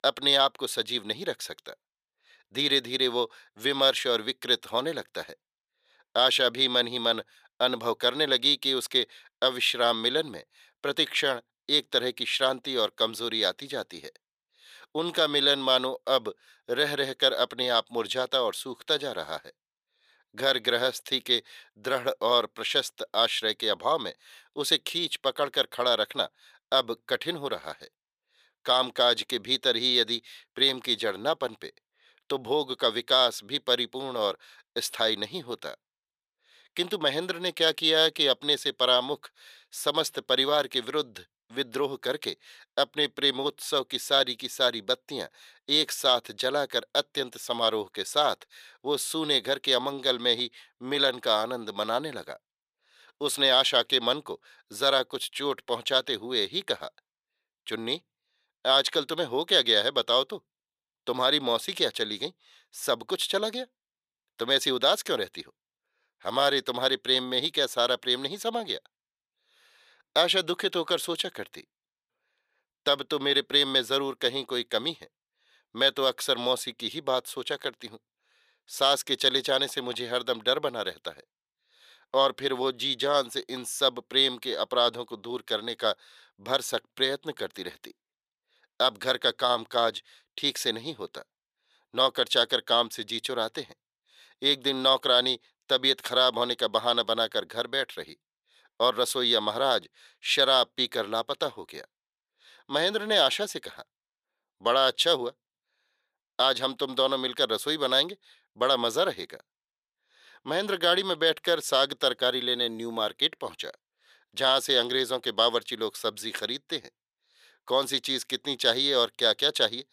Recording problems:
thin; somewhat; fading below 450 Hz

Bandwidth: 14.5 kHz